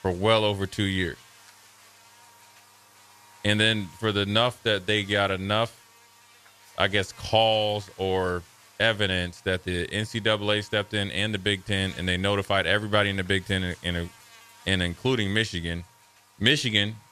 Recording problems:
electrical hum; faint; throughout; 50 Hz, 25 dB below the speech

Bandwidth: 14.5 kHz